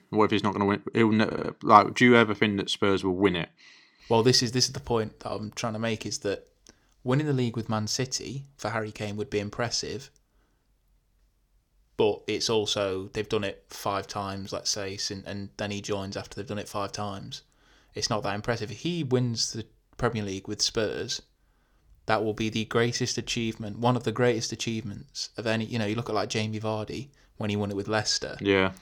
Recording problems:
audio stuttering; at 1.5 s

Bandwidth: 18.5 kHz